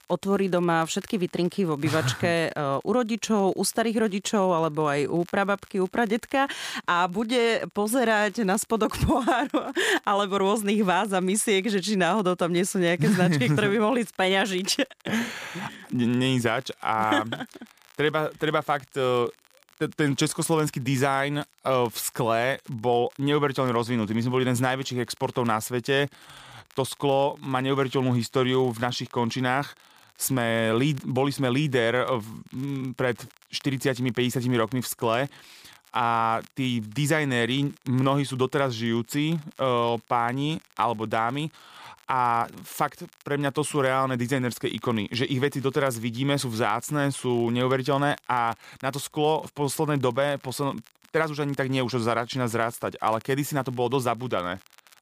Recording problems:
crackle, like an old record; faint; 30 dB below the speech

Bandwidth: 15 kHz